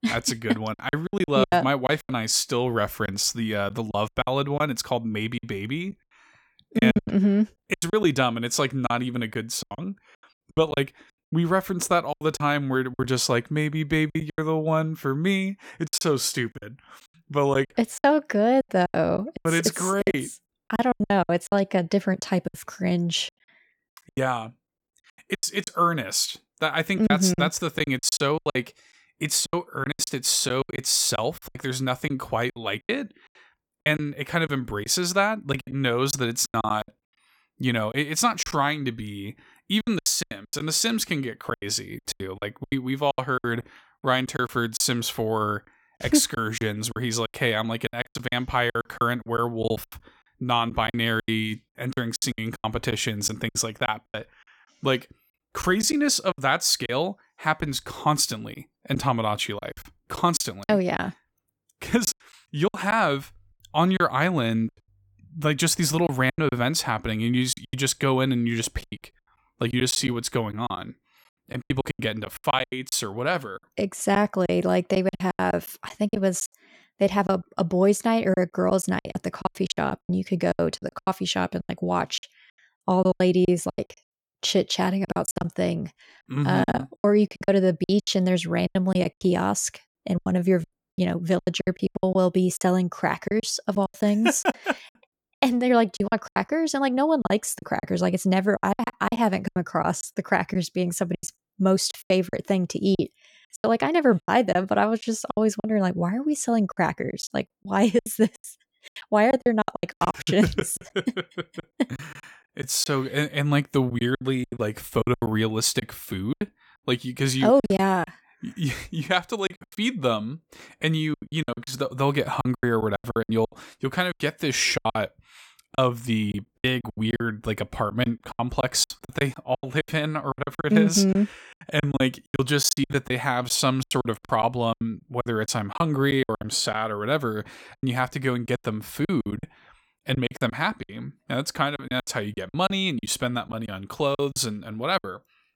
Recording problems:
choppy; very; 14% of the speech affected

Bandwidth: 17 kHz